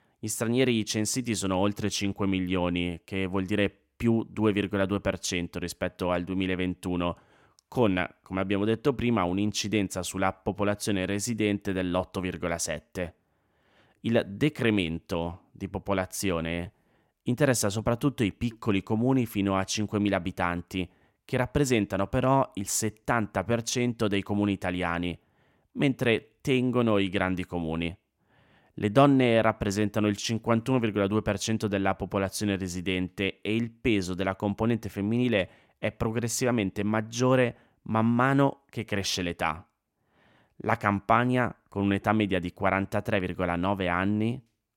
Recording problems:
none

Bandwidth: 16.5 kHz